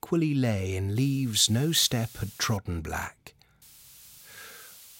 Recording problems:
hiss; faint; from 1 to 2.5 s and from 3.5 s on; 20 dB below the speech

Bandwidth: 16 kHz